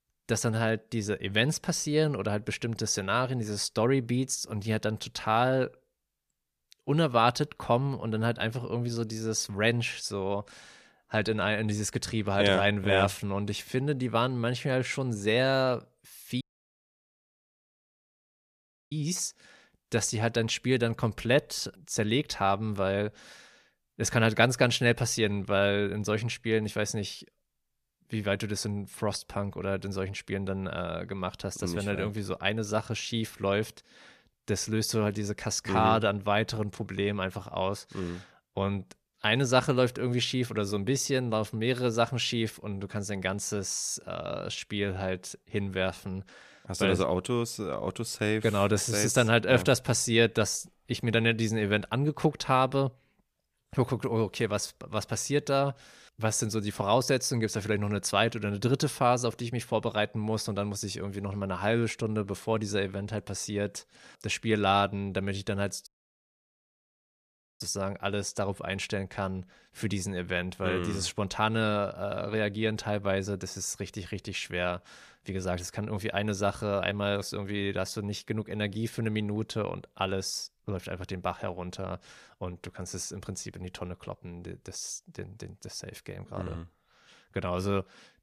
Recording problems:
audio cutting out; at 16 s for 2.5 s and at 1:06 for 1.5 s

